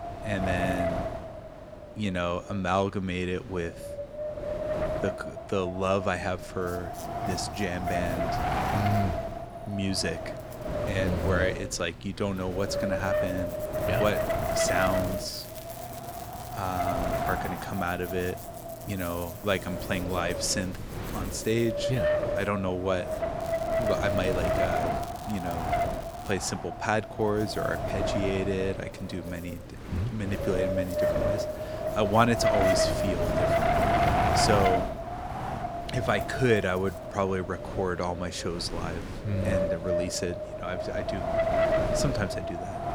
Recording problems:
wind noise on the microphone; heavy; 1 dB above the speech
electrical hum; noticeable; from 6.5 to 23 s and from 27 to 38 s; 60 Hz, 20 dB below the speech
crackling; noticeable; from 14 to 17 s and from 23 to 26 s; 20 dB below the speech

